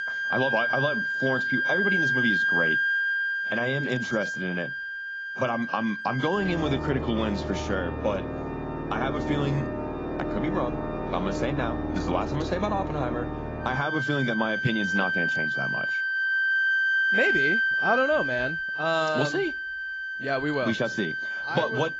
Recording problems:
garbled, watery; badly; nothing above 7.5 kHz
background music; very loud; throughout; 2 dB above the speech

